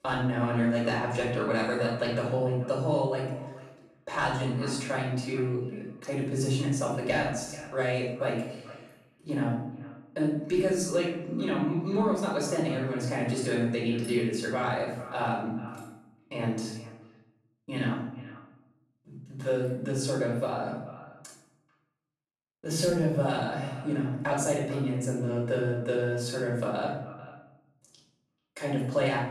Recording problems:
off-mic speech; far
room echo; noticeable; dies away in 0.8 s
echo of what is said; faint; throughout; 440 ms later, 20 dB below the speech

